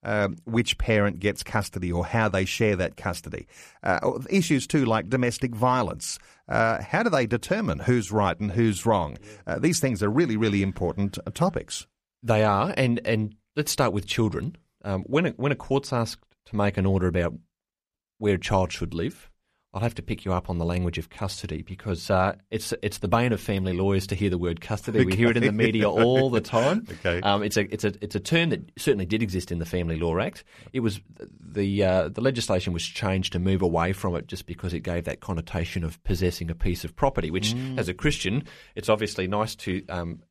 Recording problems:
none

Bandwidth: 14.5 kHz